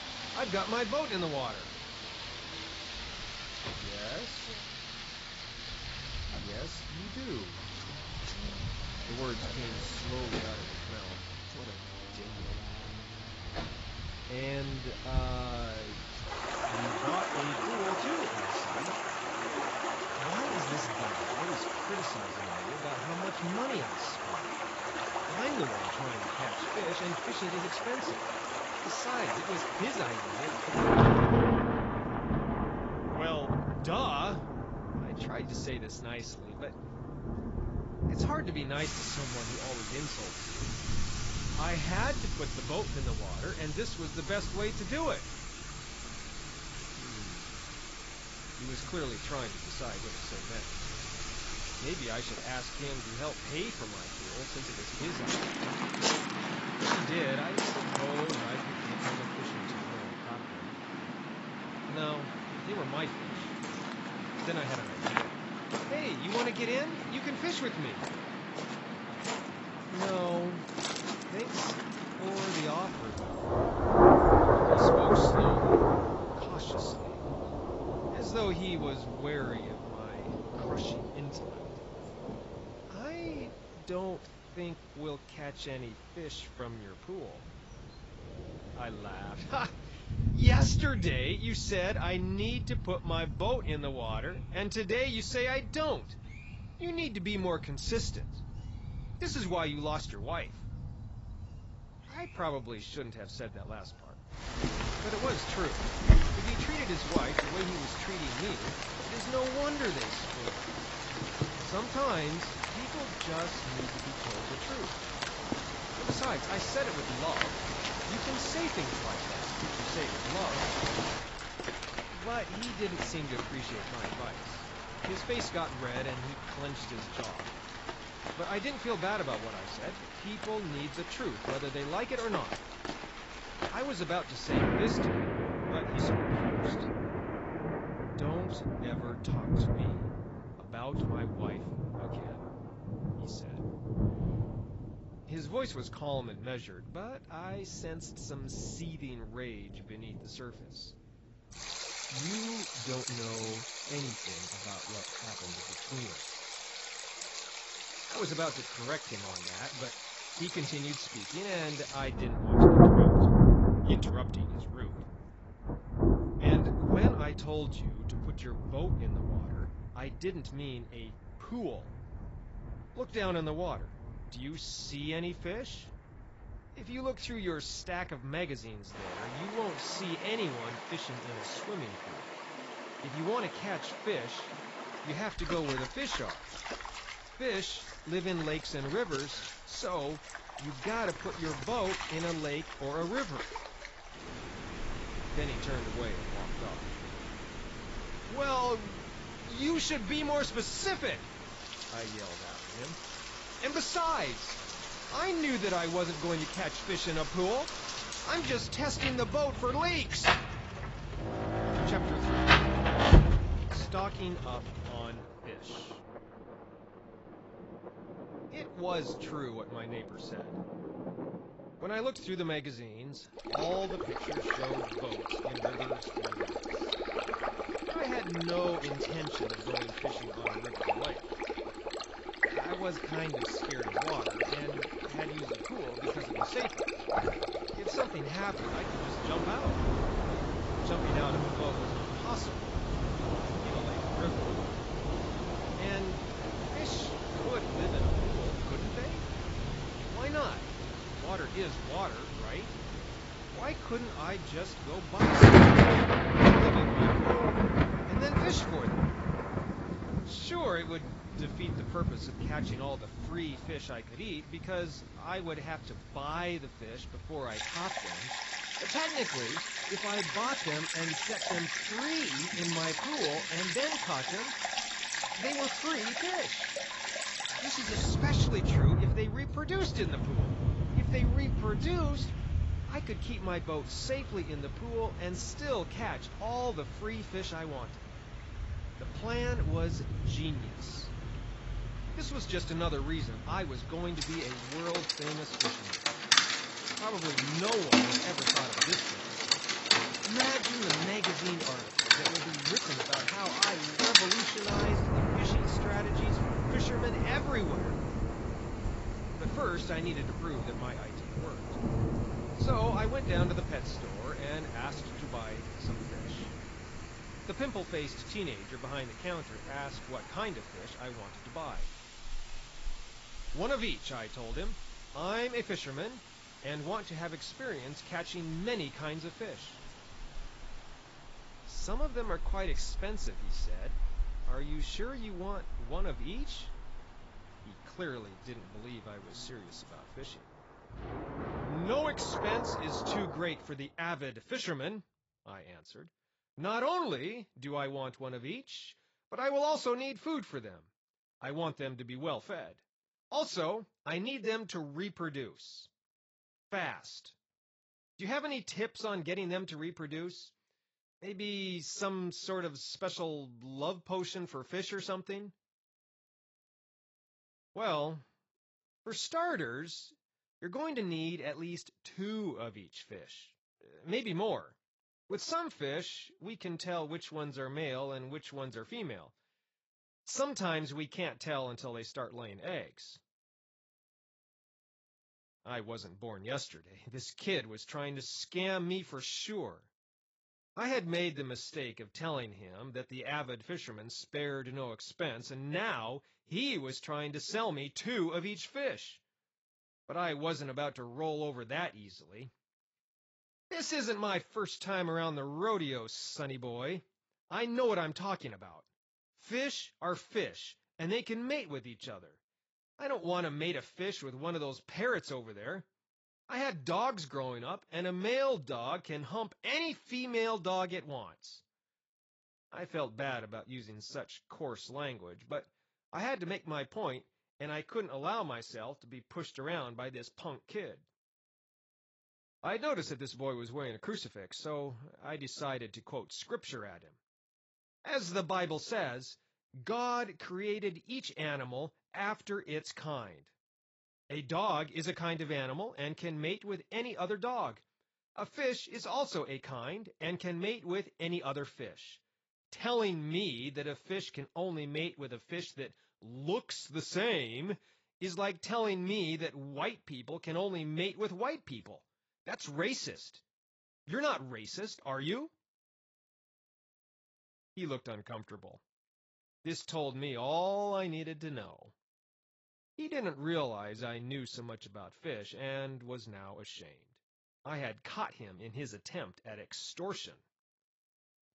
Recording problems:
garbled, watery; badly; nothing above 7.5 kHz
rain or running water; very loud; until 5:43; 5 dB above the speech

